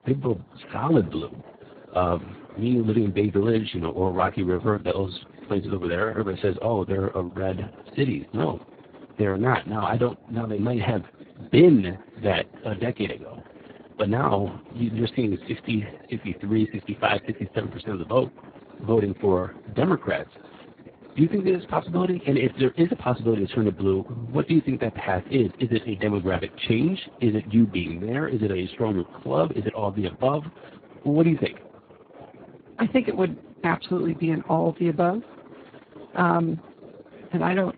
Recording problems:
garbled, watery; badly; nothing above 4 kHz
chatter from many people; faint; throughout; 20 dB below the speech

